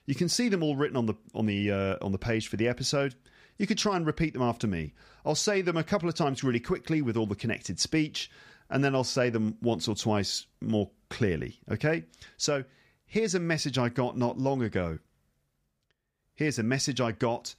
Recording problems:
none

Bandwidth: 15 kHz